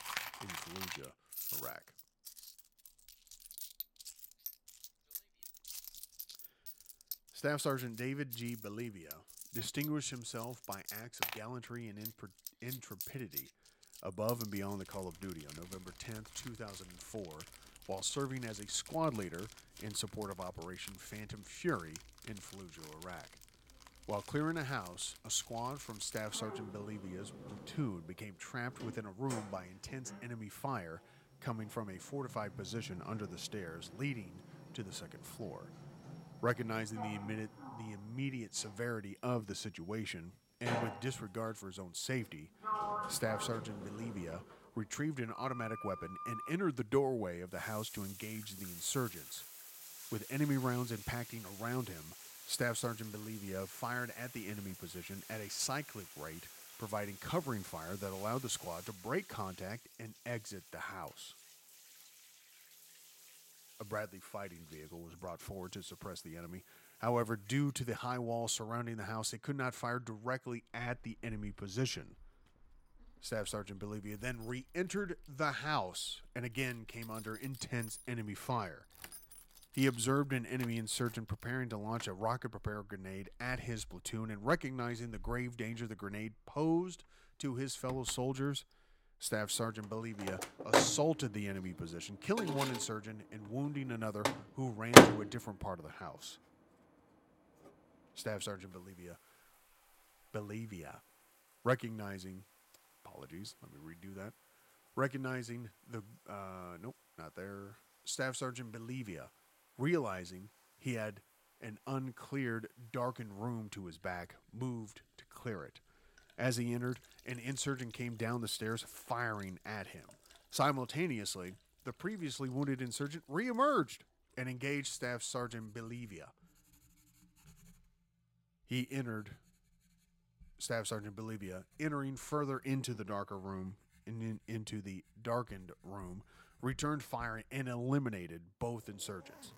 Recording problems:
household noises; very loud; throughout; 2 dB above the speech

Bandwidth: 16.5 kHz